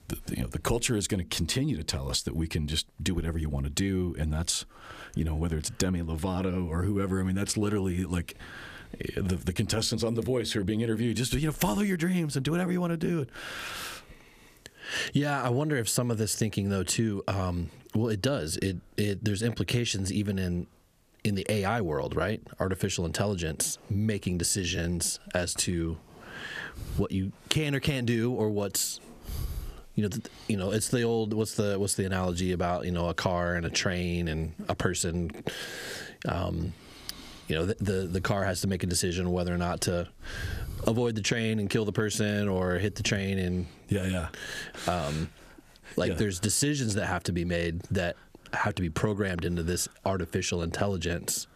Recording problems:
squashed, flat; somewhat

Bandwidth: 14.5 kHz